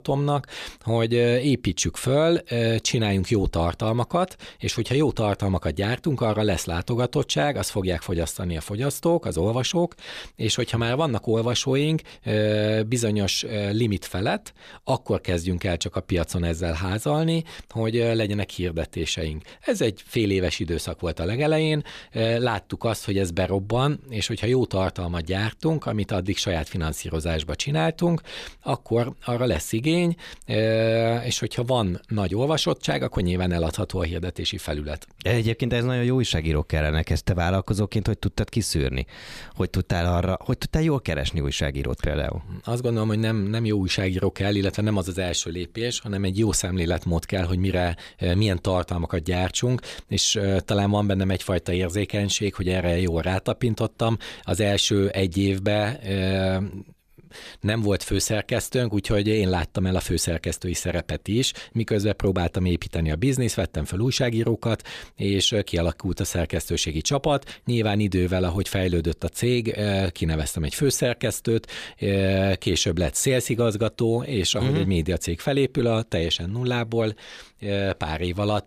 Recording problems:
none

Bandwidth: 14.5 kHz